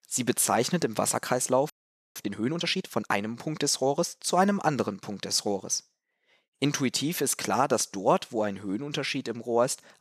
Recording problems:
audio freezing; at 1.5 s

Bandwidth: 14 kHz